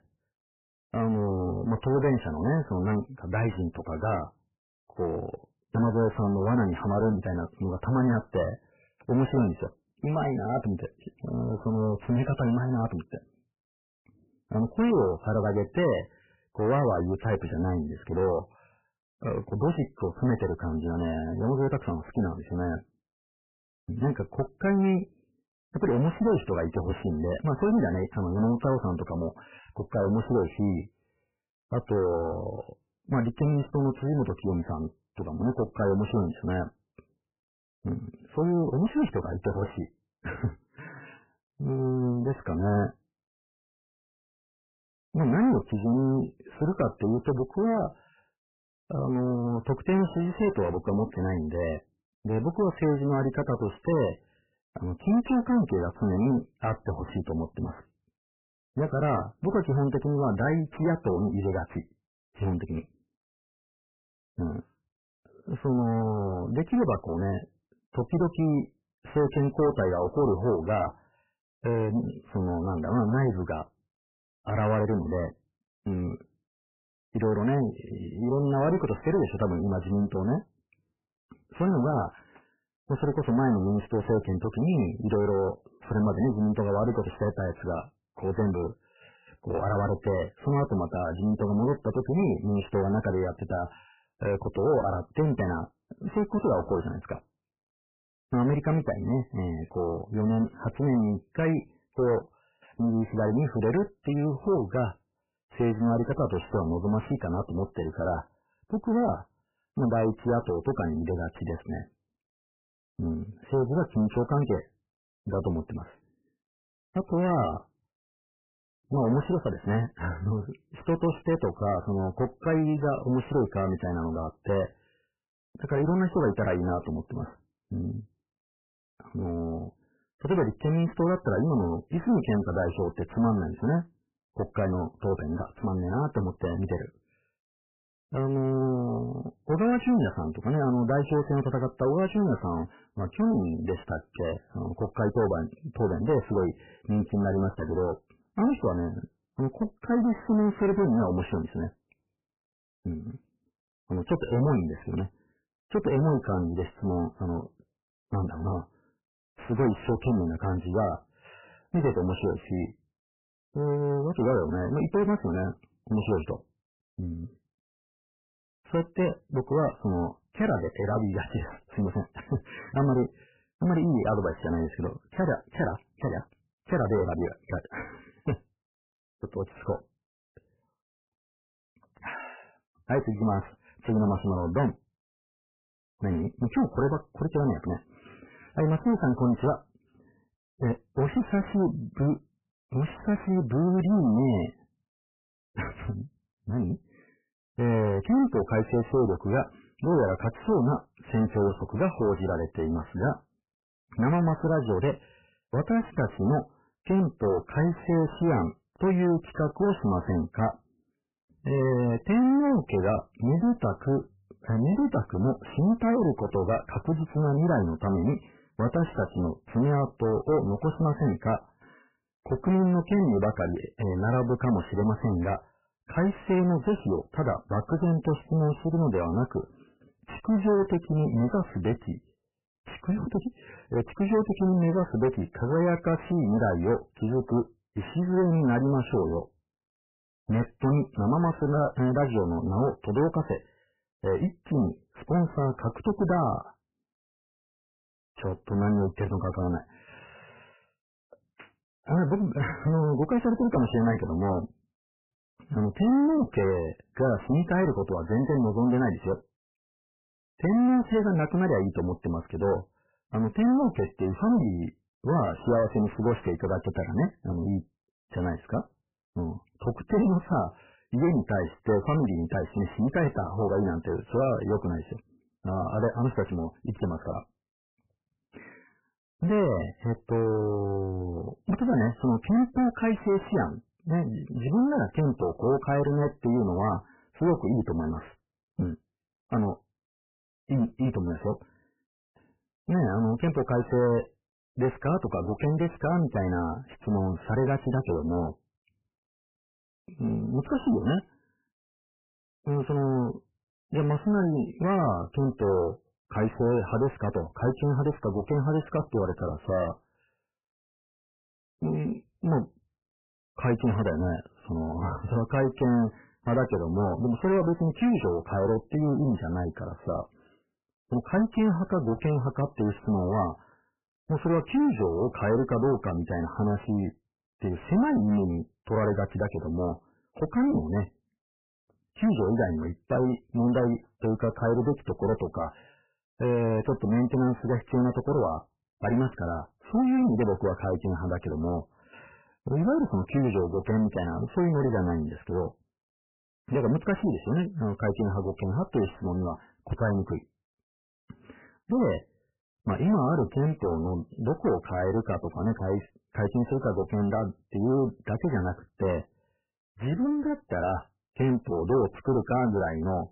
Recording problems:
distortion; heavy; 6 dB below the speech
garbled, watery; badly; nothing above 3 kHz

